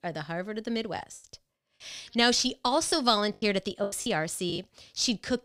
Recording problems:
choppy; very; at 1 s and from 3 to 4.5 s; 12% of the speech affected

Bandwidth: 15.5 kHz